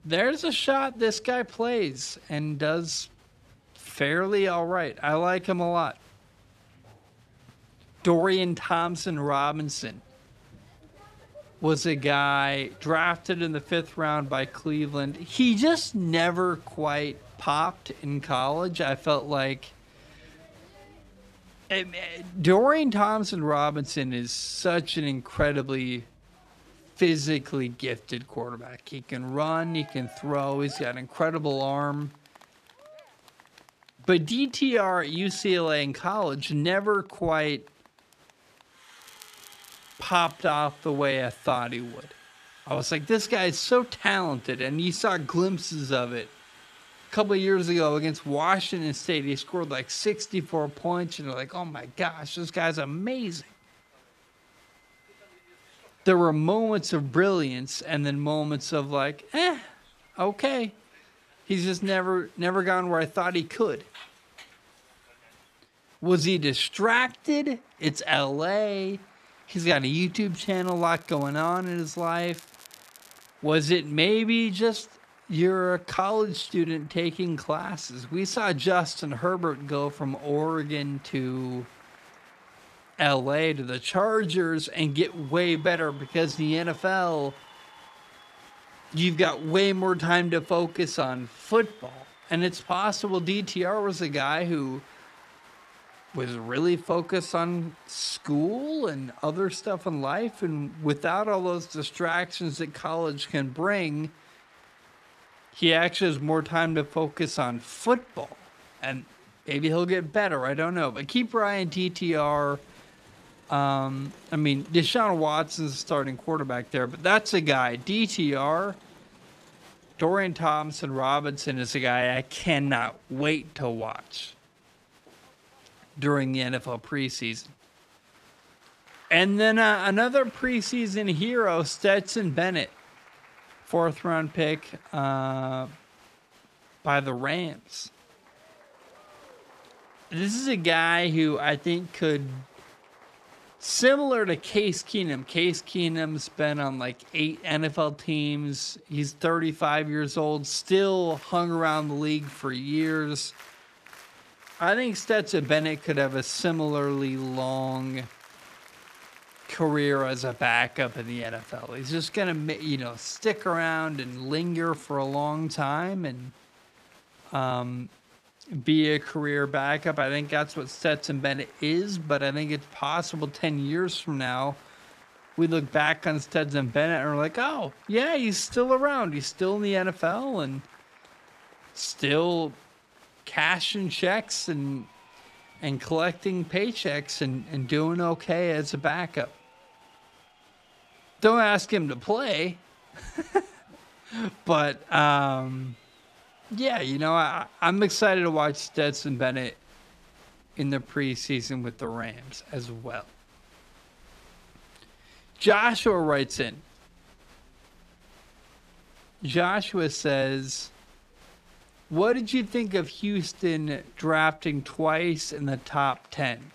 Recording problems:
wrong speed, natural pitch; too slow; 0.7 times normal speed
crowd noise; faint; throughout; 25 dB below the speech
crackling; faint; from 39 to 40 s and from 1:10 to 1:13; 25 dB below the speech

